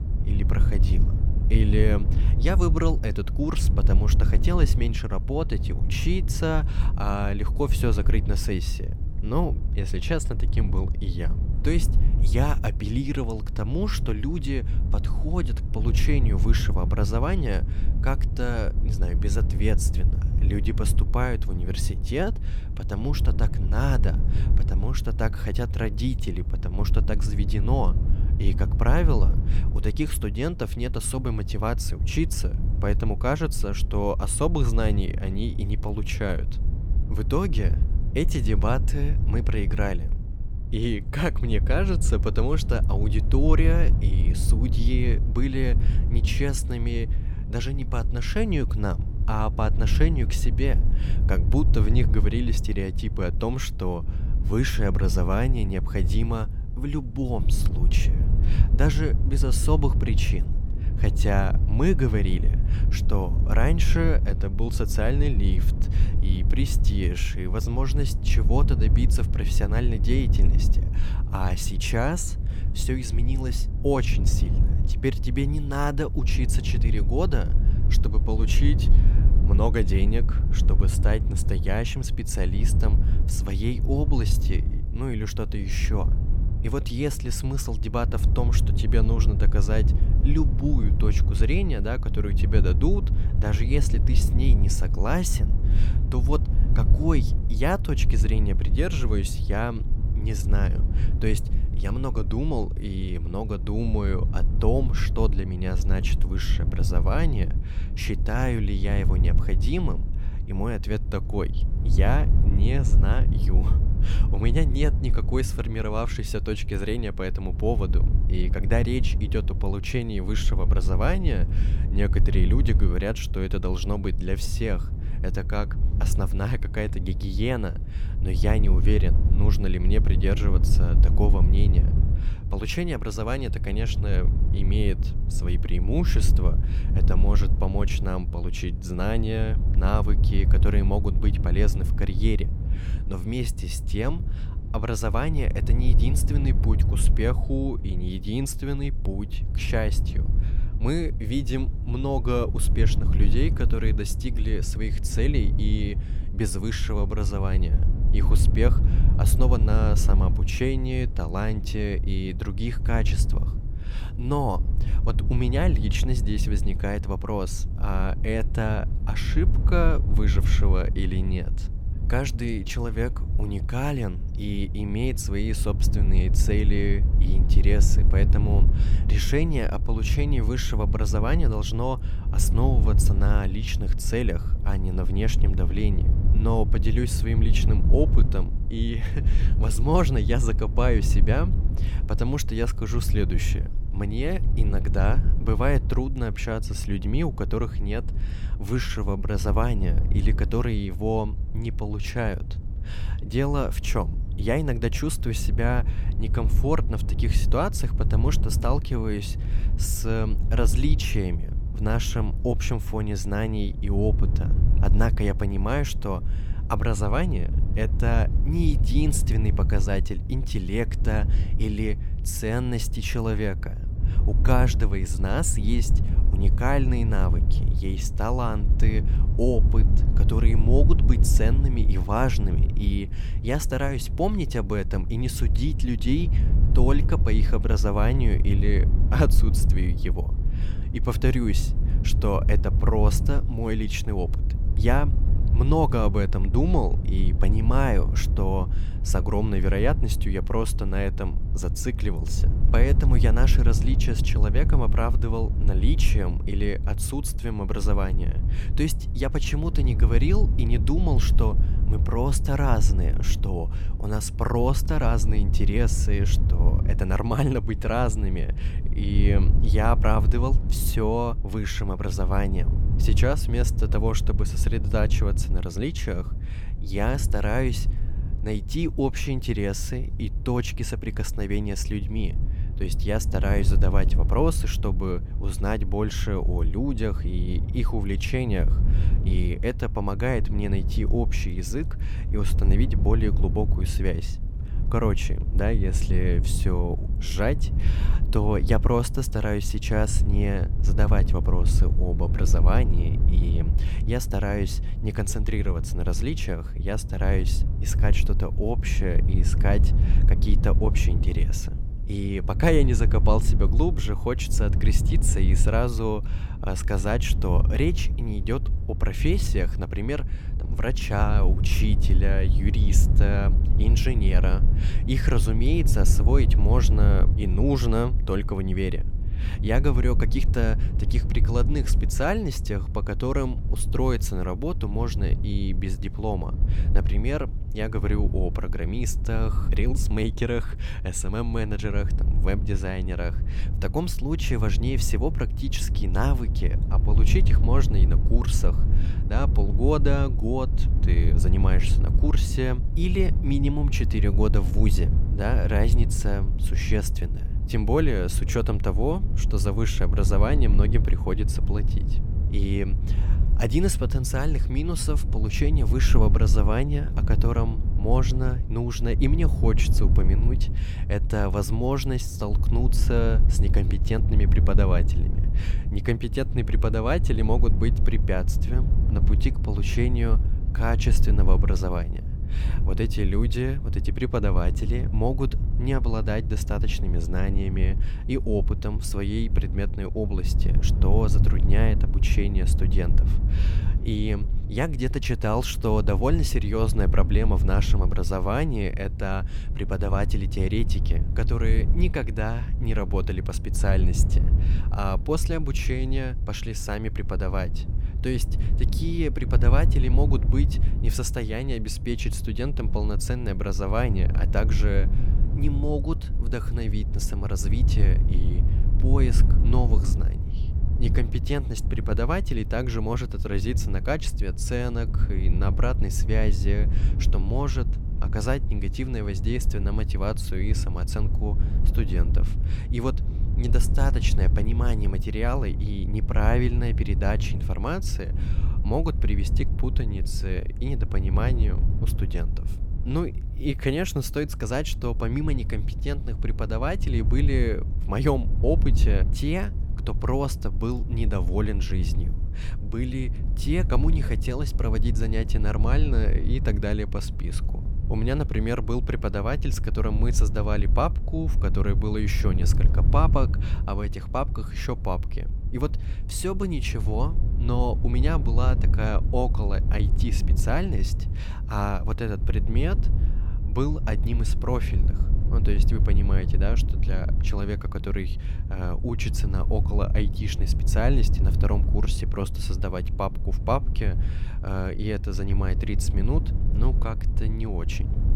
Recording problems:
wind noise on the microphone; occasional gusts; 10 dB below the speech

